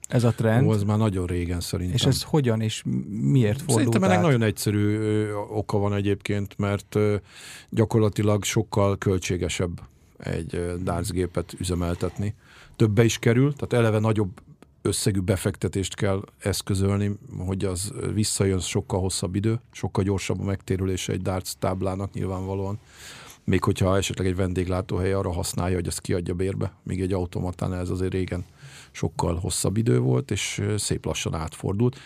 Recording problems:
none

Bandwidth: 15 kHz